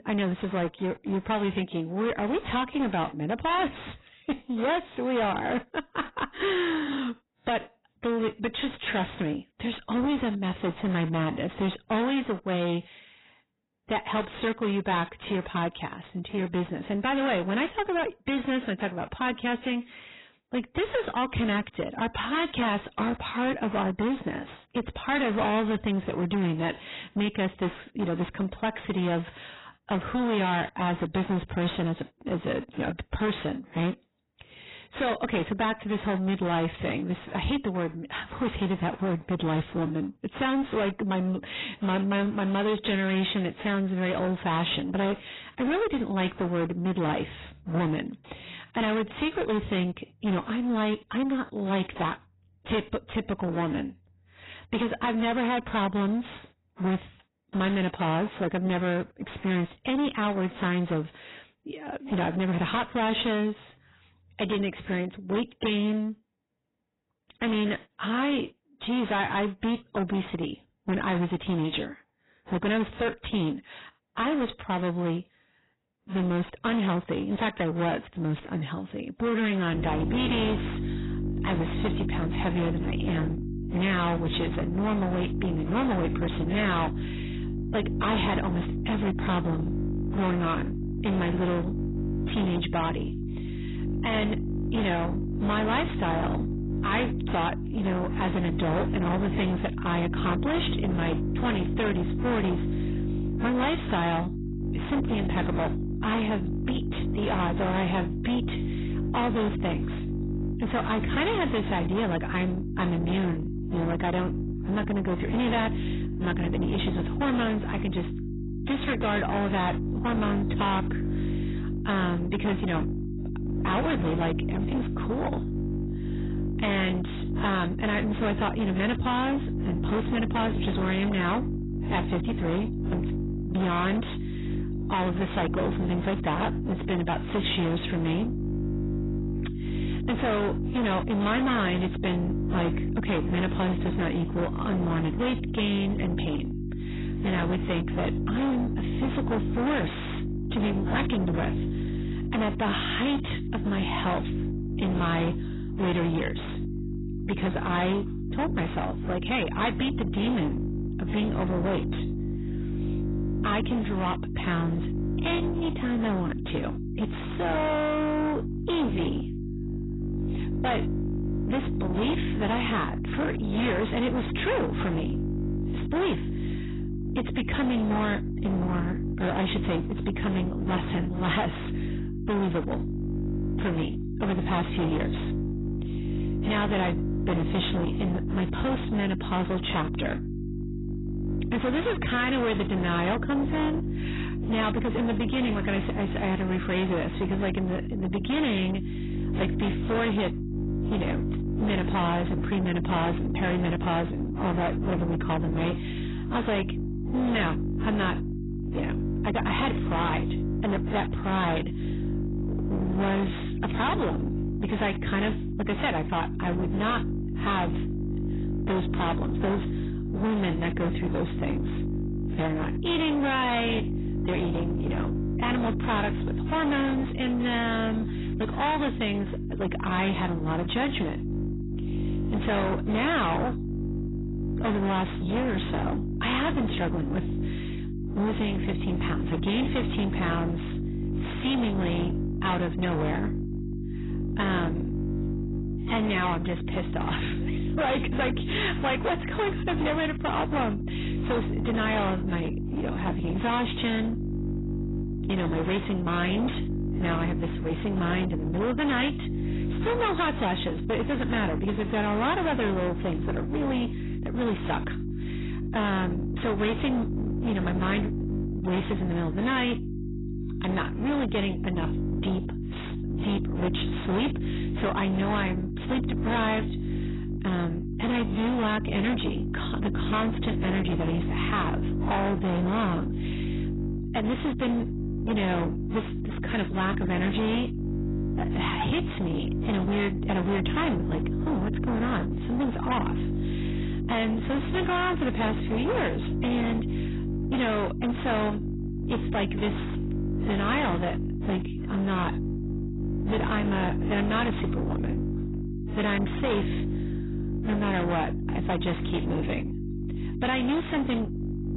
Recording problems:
distortion; heavy; 26% of the sound clipped
garbled, watery; badly; nothing above 4 kHz
electrical hum; loud; from 1:20 on; 50 Hz, 8 dB below the speech

